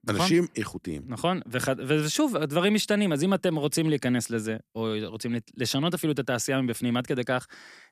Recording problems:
none

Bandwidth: 14.5 kHz